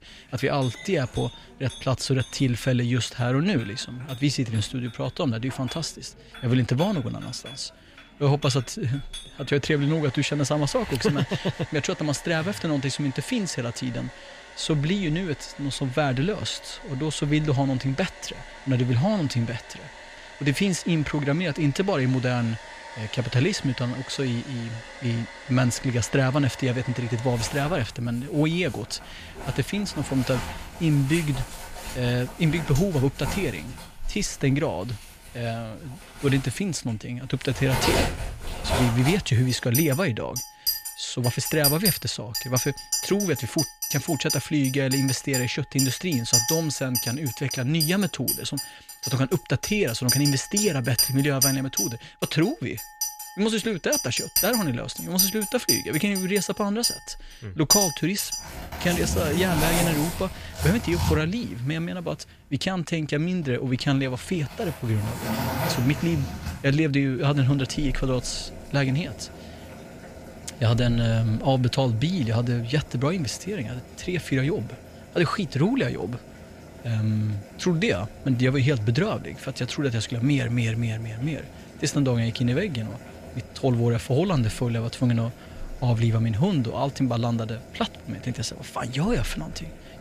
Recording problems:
household noises; loud; throughout; 4 dB below the speech

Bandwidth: 15 kHz